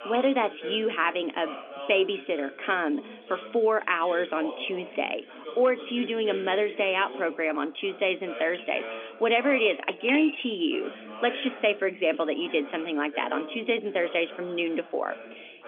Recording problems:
phone-call audio; nothing above 3.5 kHz
background chatter; noticeable; throughout; 2 voices, 15 dB below the speech
clattering dishes; noticeable; from 8.5 to 11 s; peak 5 dB below the speech

